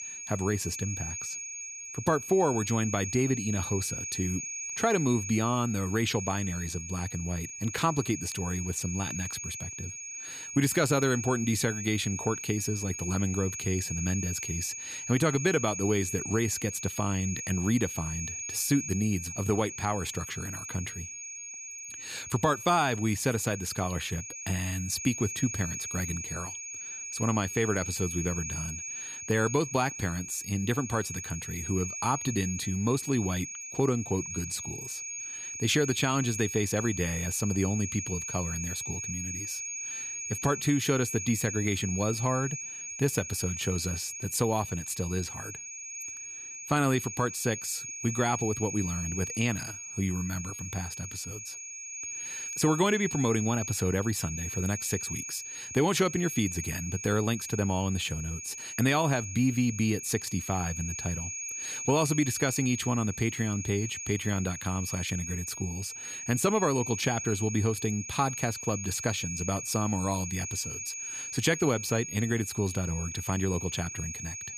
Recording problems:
high-pitched whine; loud; throughout; 6.5 kHz, 5 dB below the speech

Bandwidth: 15 kHz